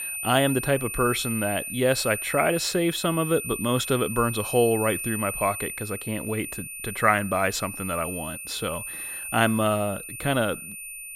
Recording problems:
high-pitched whine; loud; throughout; 2.5 kHz, 7 dB below the speech

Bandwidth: 16.5 kHz